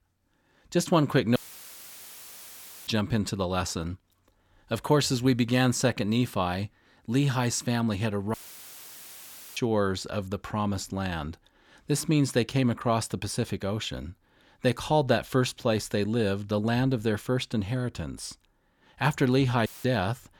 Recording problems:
audio cutting out; filled with static; at 1.5 s for 1.5 s, at 8.5 s for 1 s and at 20 s

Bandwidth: 18.5 kHz